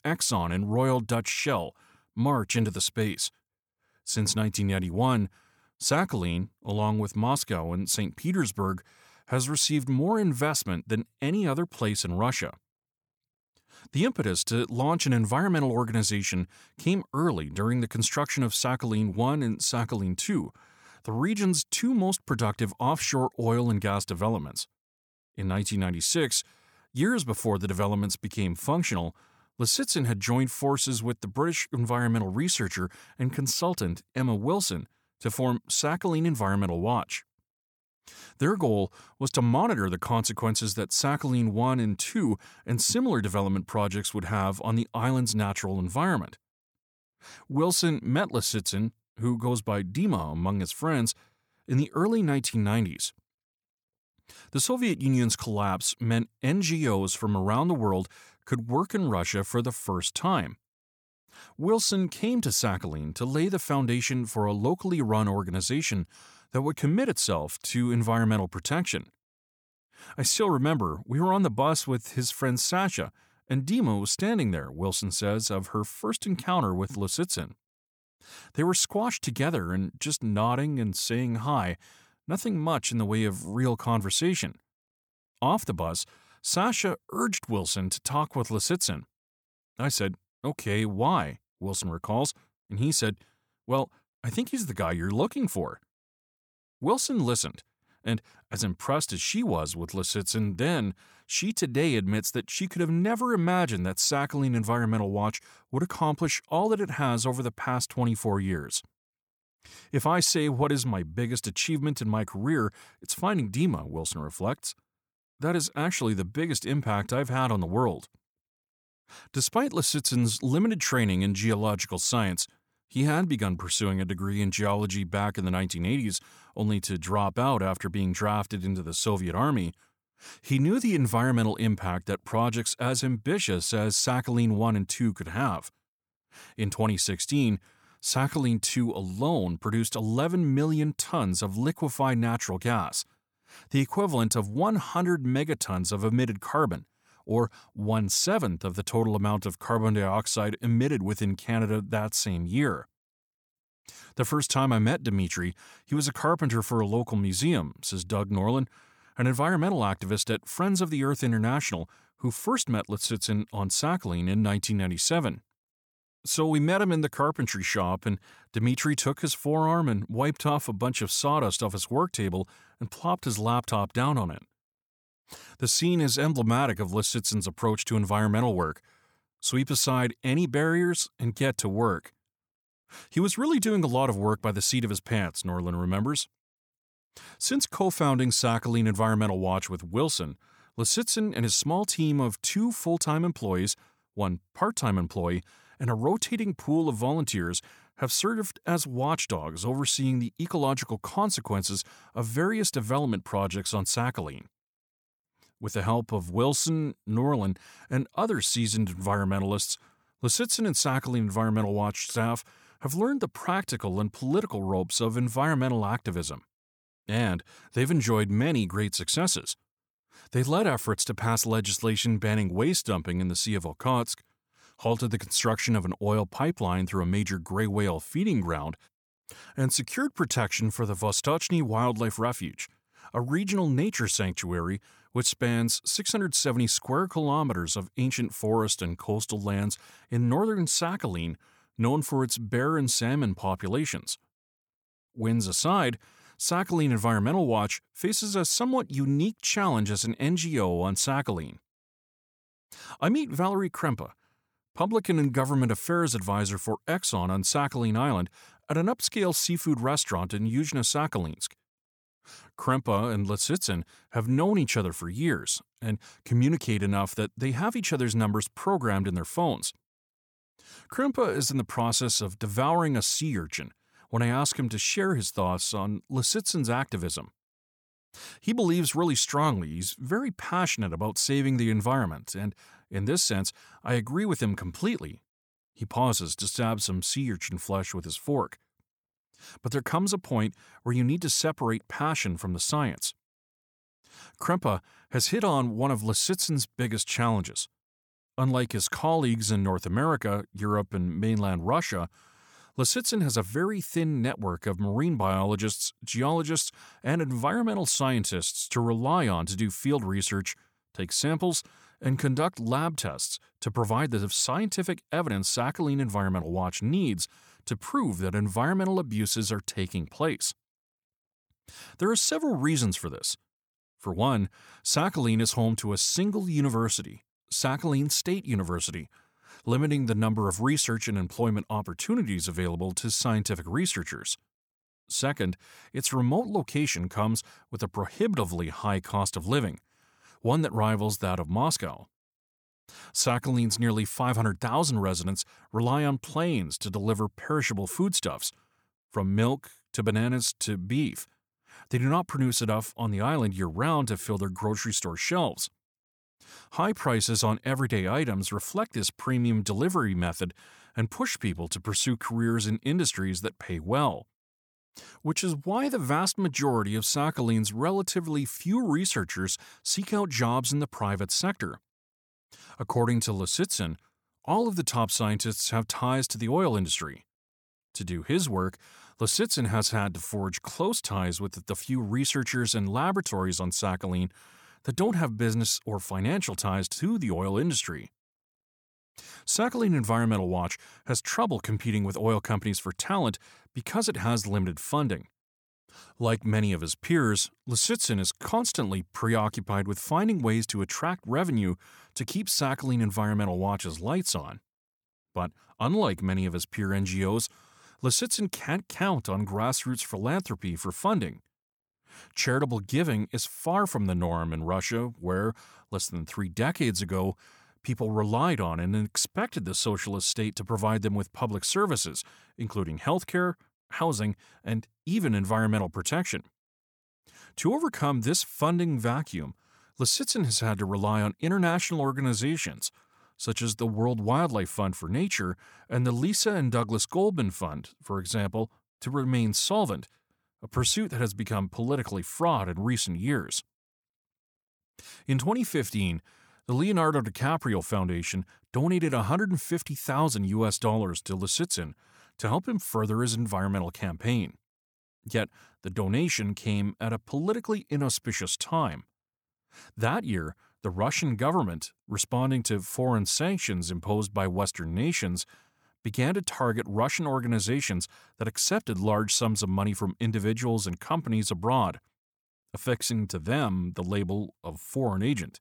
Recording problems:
none

